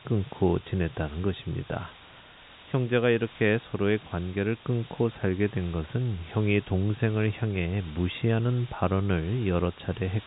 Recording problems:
high frequencies cut off; severe; nothing above 4 kHz
hiss; faint; throughout; 20 dB below the speech

